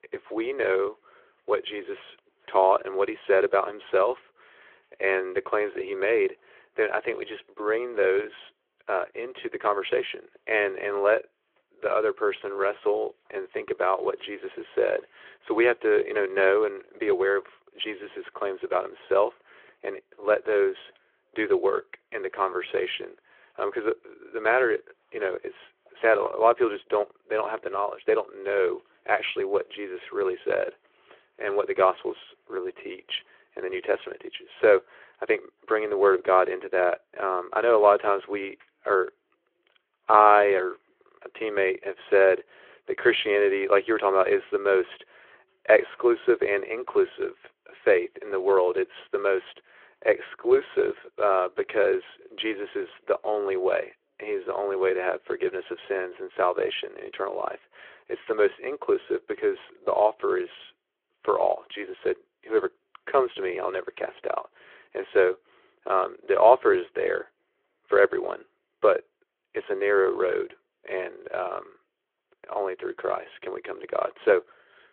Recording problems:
phone-call audio

